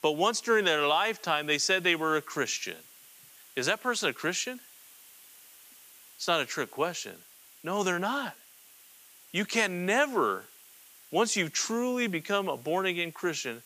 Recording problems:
hiss; faint; throughout; 25 dB below the speech

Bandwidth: 15 kHz